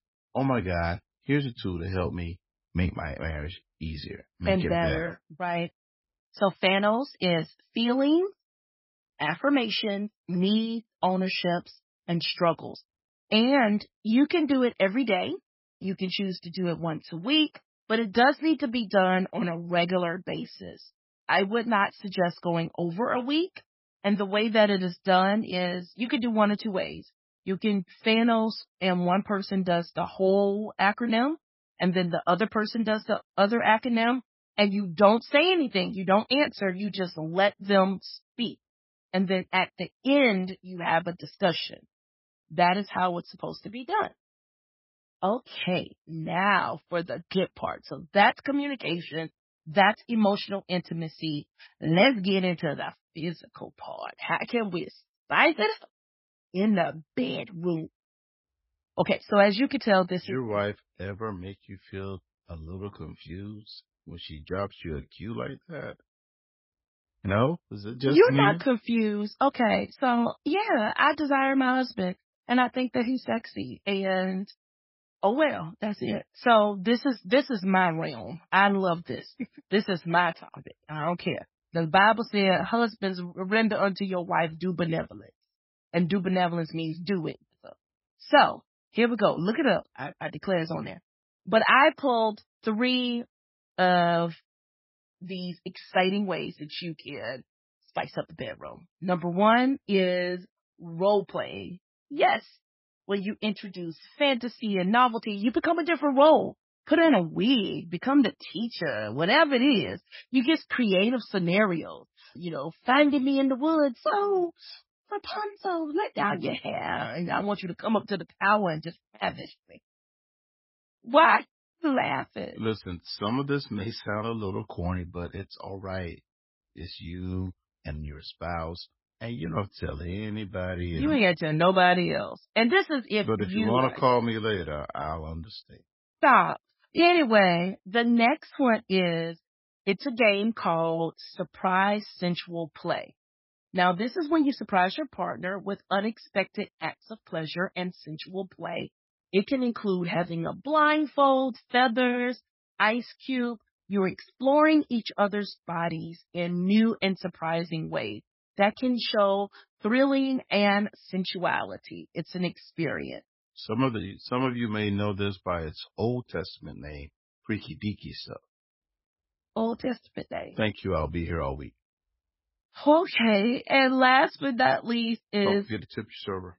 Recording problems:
garbled, watery; badly; nothing above 5.5 kHz

